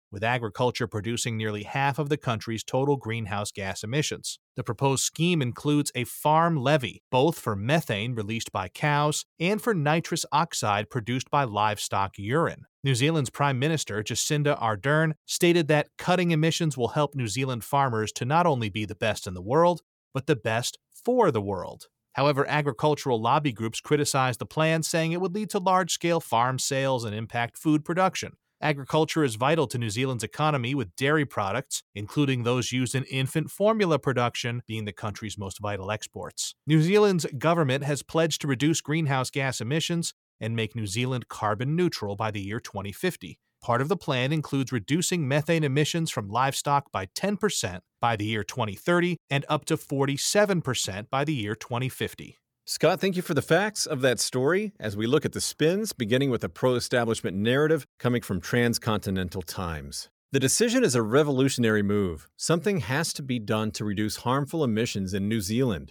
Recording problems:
none

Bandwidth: 18.5 kHz